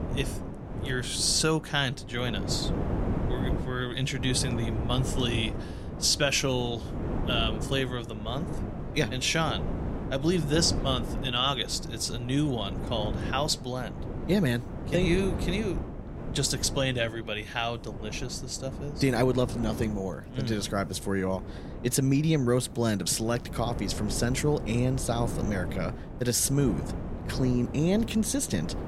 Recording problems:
wind noise on the microphone; occasional gusts; 10 dB below the speech

